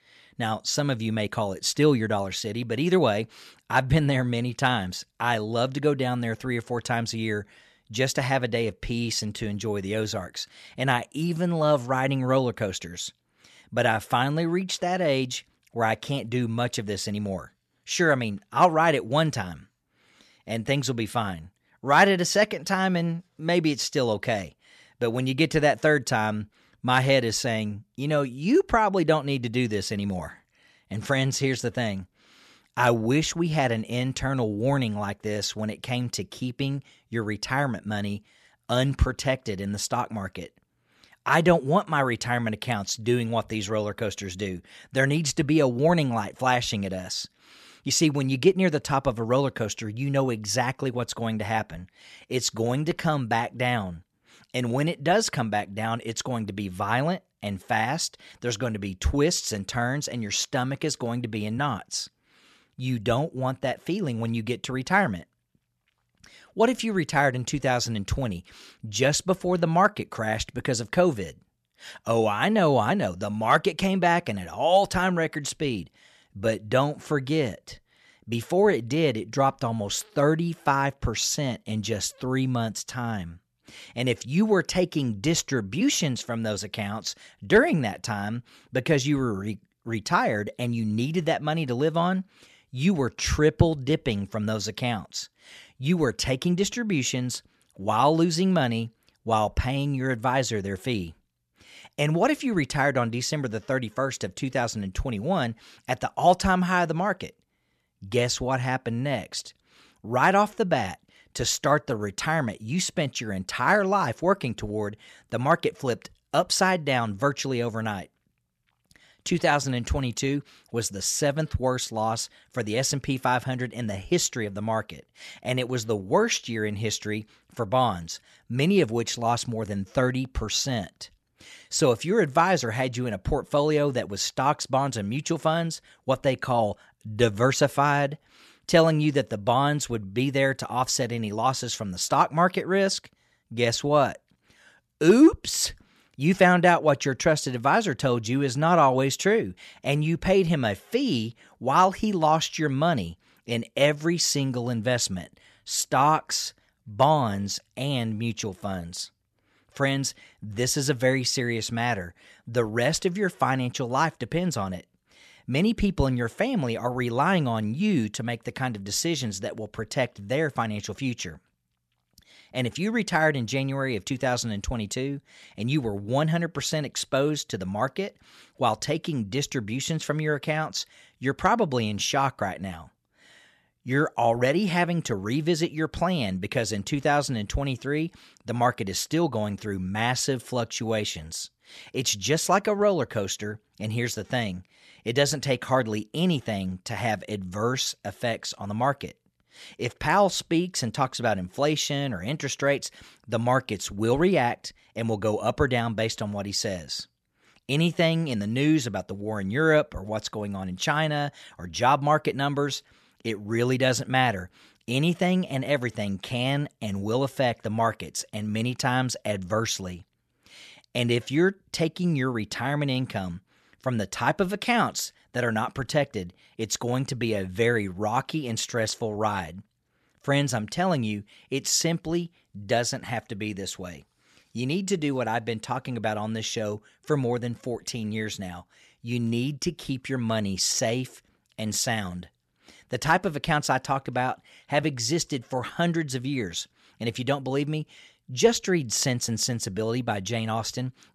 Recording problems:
none

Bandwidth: 13.5 kHz